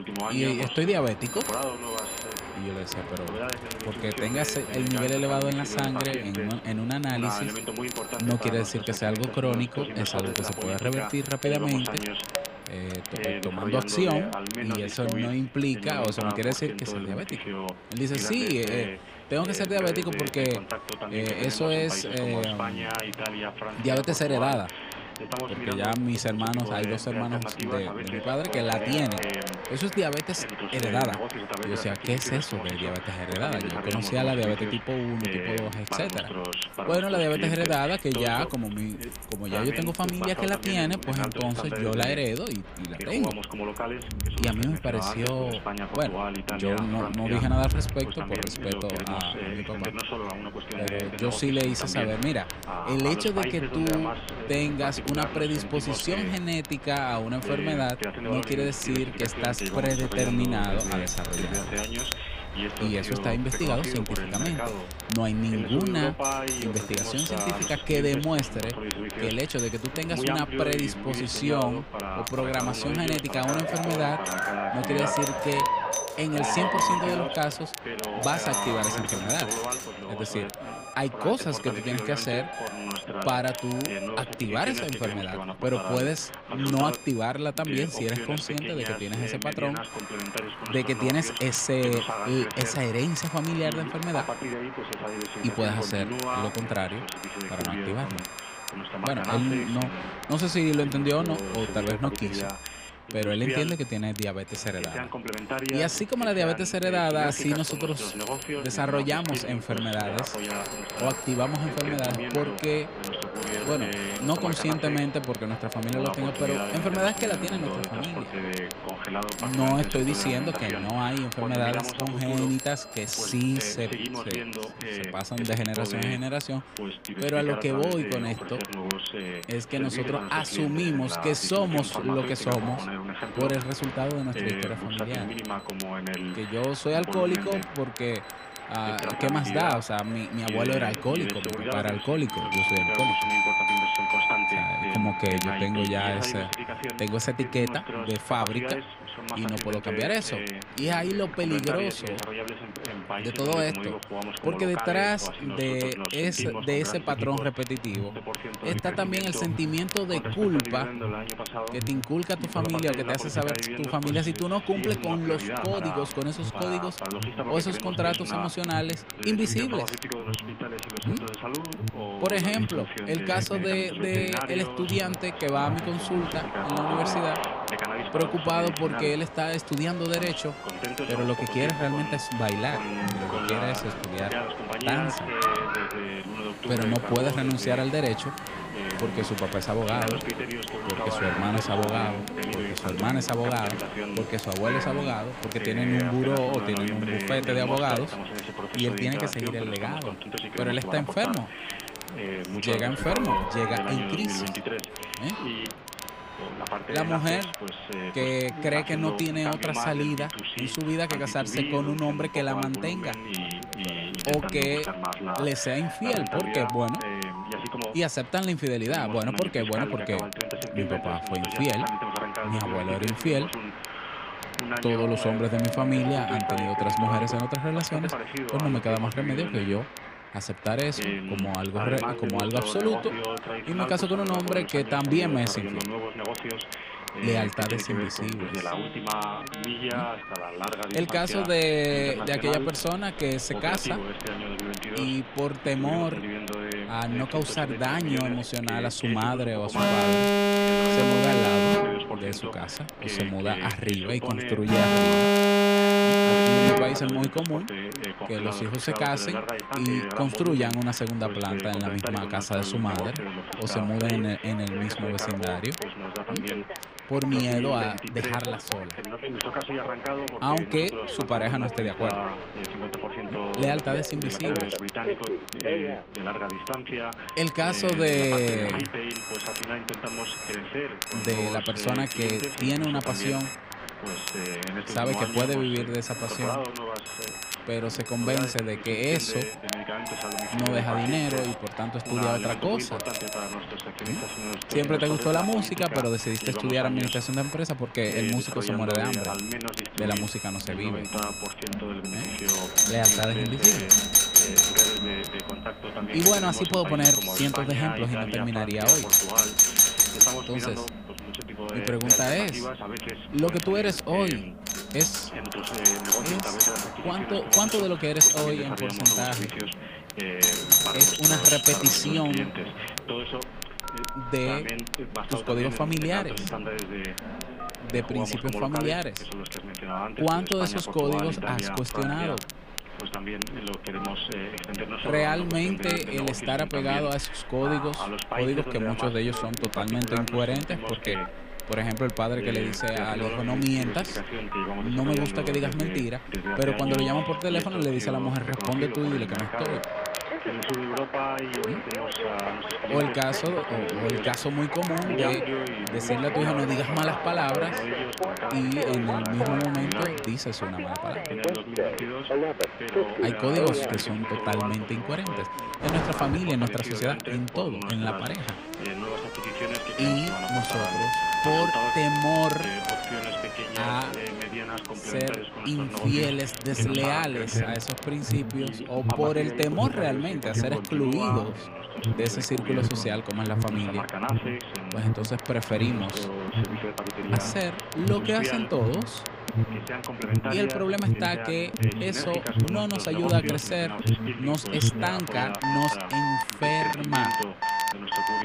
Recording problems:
alarms or sirens; very loud; throughout; 1 dB above the speech
voice in the background; loud; throughout; 5 dB below the speech
crowd noise; noticeable; throughout; 10 dB below the speech
crackle, like an old record; noticeable; 10 dB below the speech
traffic noise; faint; until 1:49; 20 dB below the speech

